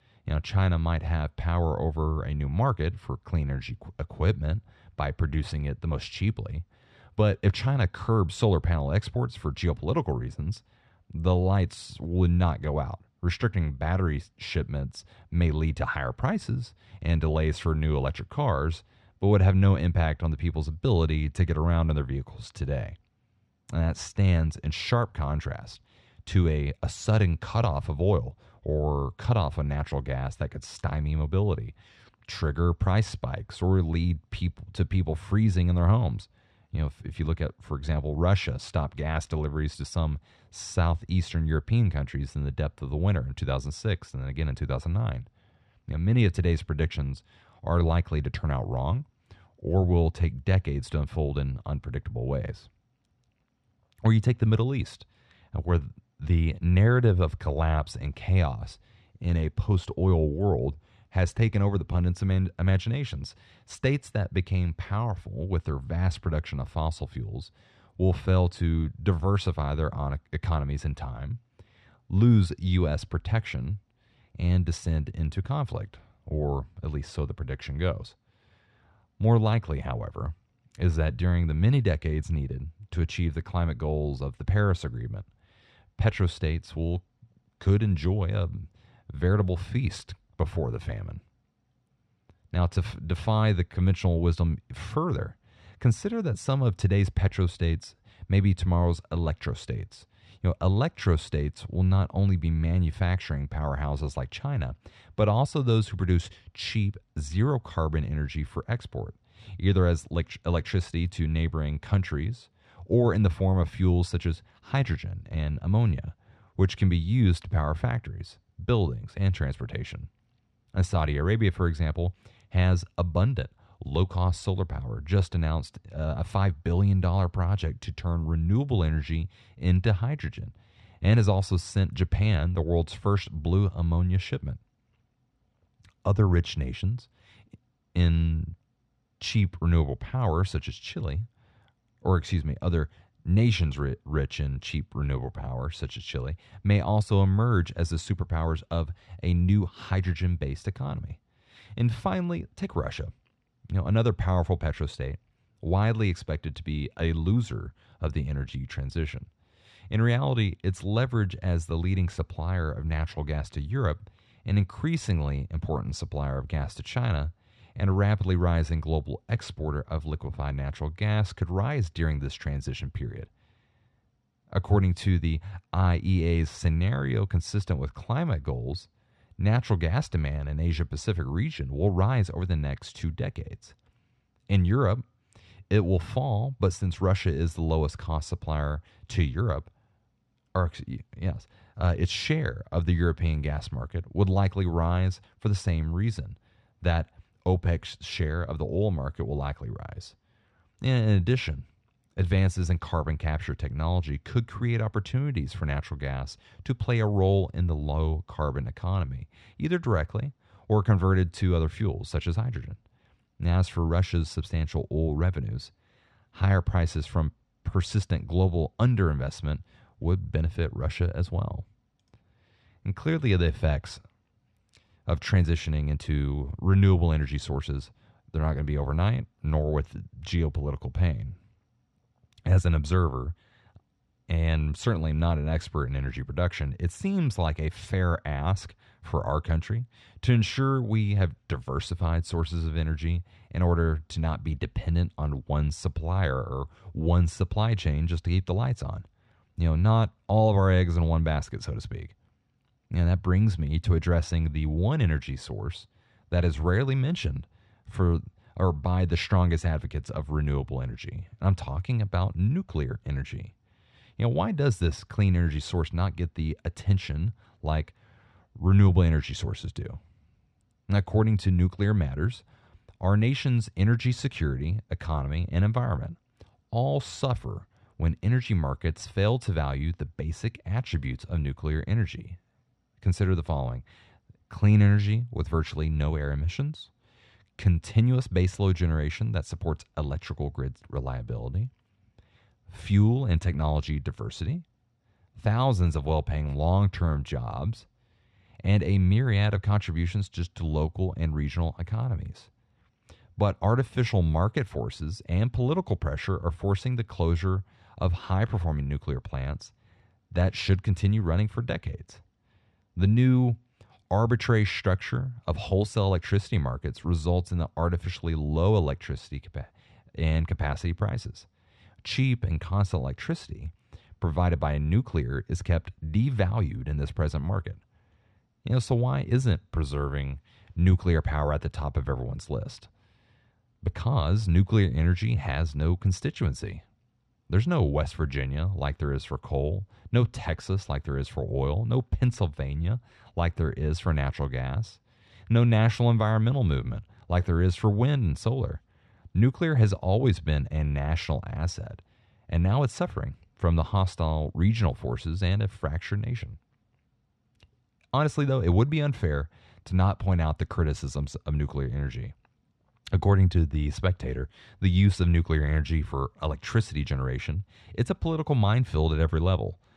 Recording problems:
muffled; slightly; fading above 4 kHz

